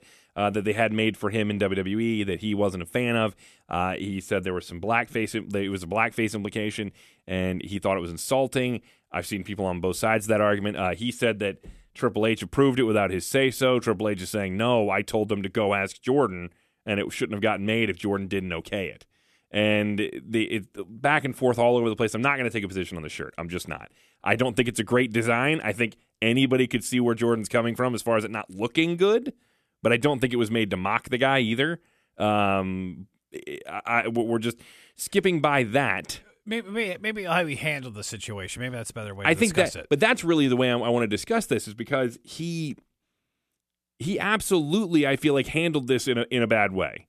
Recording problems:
none

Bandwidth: 14 kHz